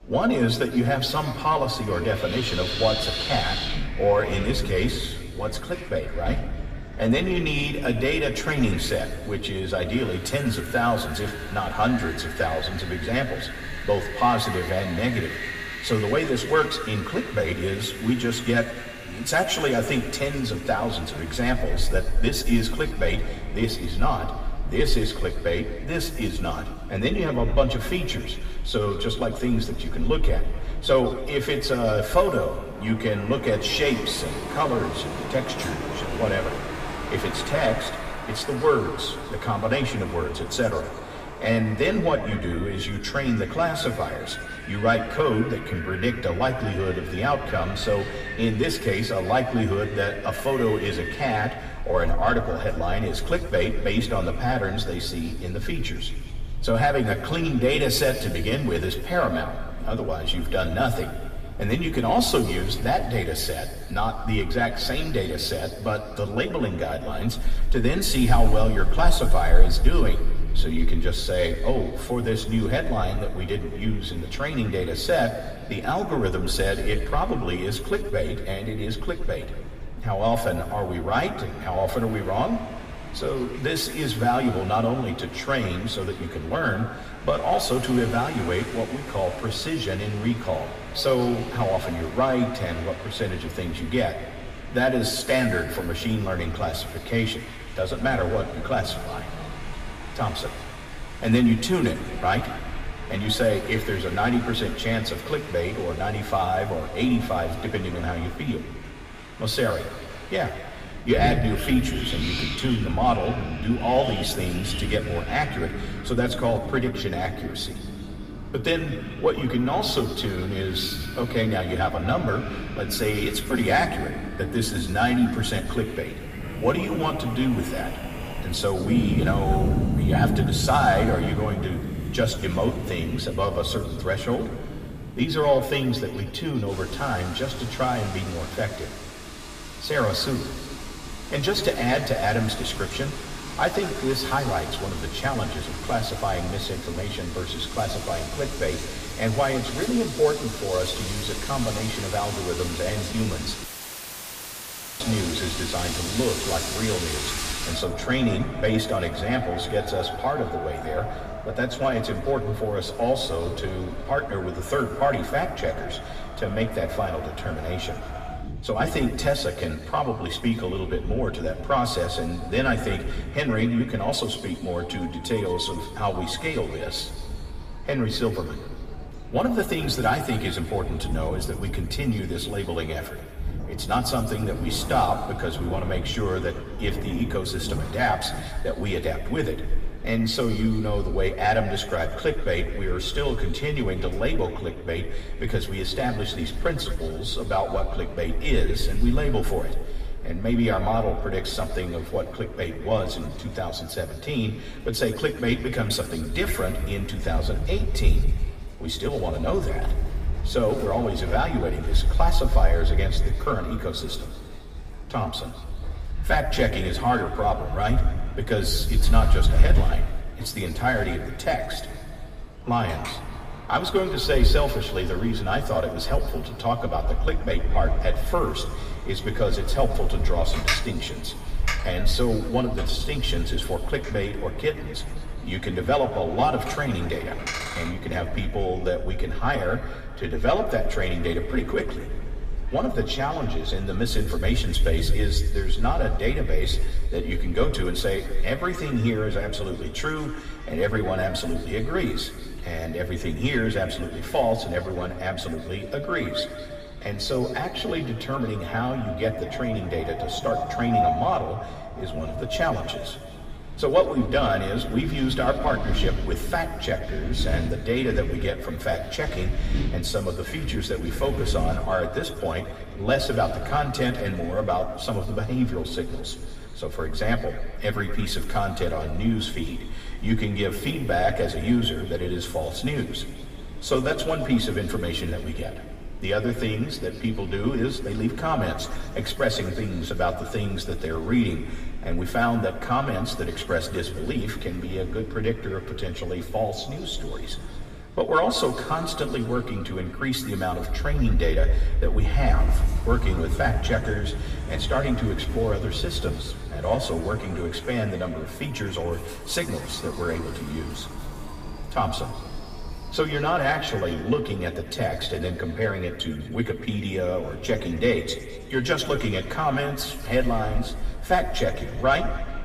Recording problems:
room echo; slight; dies away in 1.9 s
off-mic speech; somewhat distant
wind in the background; loud; throughout; 8 dB below the speech
murmuring crowd; faint; throughout; 30 dB below the speech
audio cutting out; filled with static; at 2:34 for 1.5 s

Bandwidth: 15 kHz